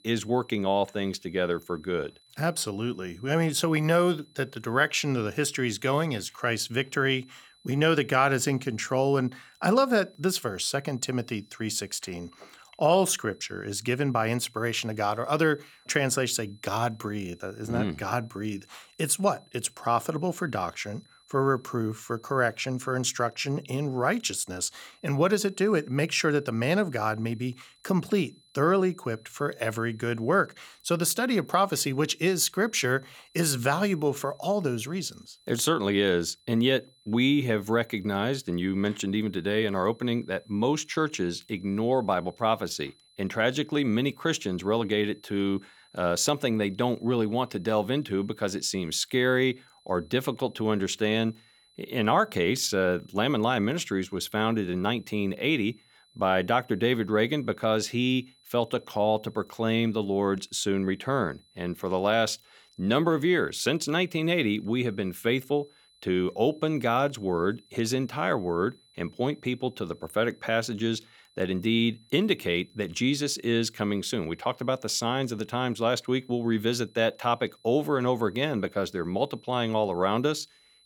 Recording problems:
high-pitched whine; faint; throughout; 4 kHz, 30 dB below the speech

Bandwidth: 17.5 kHz